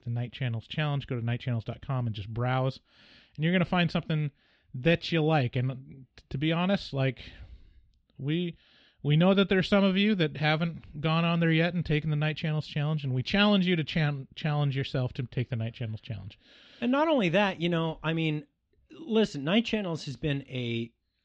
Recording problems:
muffled; slightly; fading above 4 kHz

